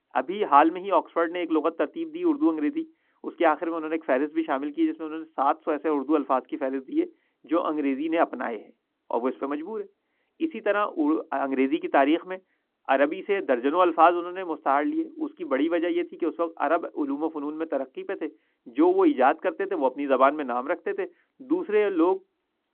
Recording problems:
muffled; very; fading above 1.5 kHz
phone-call audio

